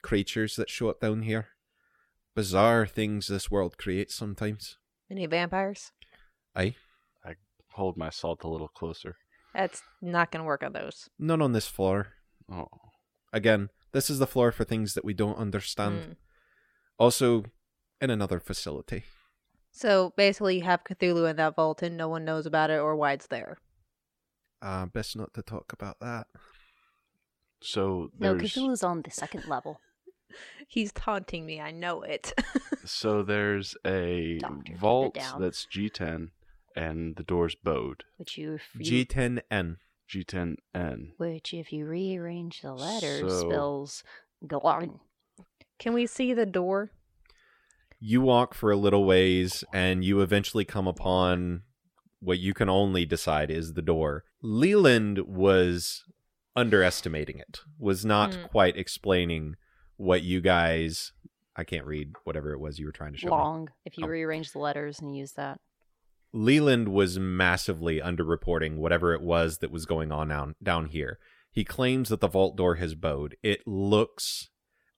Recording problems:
none

